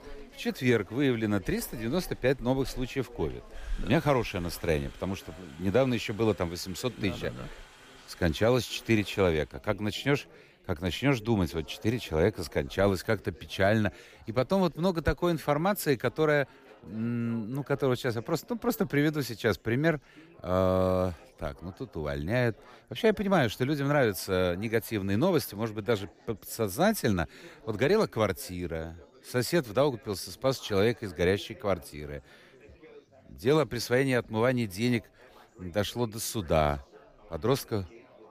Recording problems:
chatter from many people; faint; throughout; 25 dB below the speech

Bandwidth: 15 kHz